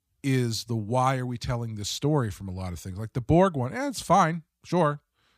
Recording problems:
none

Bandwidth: 15 kHz